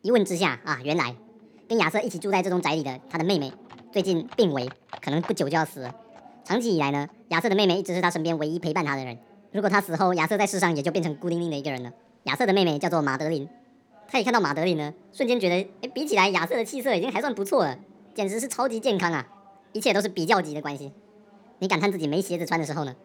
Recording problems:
wrong speed and pitch; too fast and too high; 1.5 times normal speed
animal sounds; faint; throughout; 25 dB below the speech
background chatter; faint; throughout; 4 voices, 30 dB below the speech

